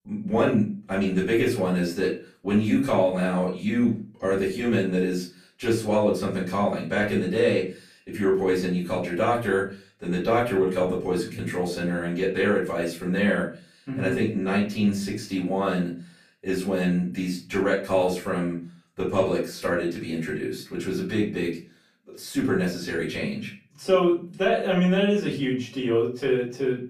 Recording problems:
off-mic speech; far
room echo; slight; dies away in 0.3 s

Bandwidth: 15 kHz